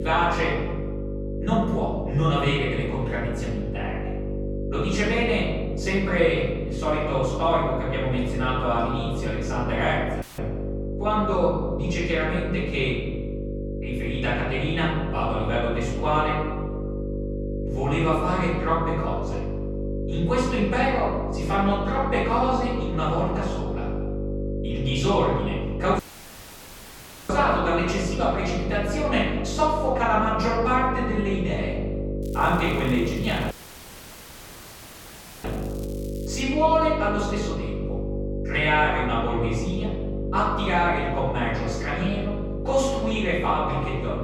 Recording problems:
off-mic speech; far
room echo; noticeable; dies away in 1.2 s
electrical hum; noticeable; throughout; 50 Hz, 10 dB below the speech
crackling; faint; from 32 to 36 s; 25 dB below the speech
abrupt cut into speech; at the start and the end
audio cutting out; filled with static; at 10 s, at 26 s for 1.5 s and at 34 s for 2 s

